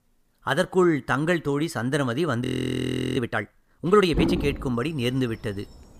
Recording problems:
animal sounds; loud; from 3 s on; 4 dB below the speech
audio freezing; at 2.5 s for 0.5 s

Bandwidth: 15 kHz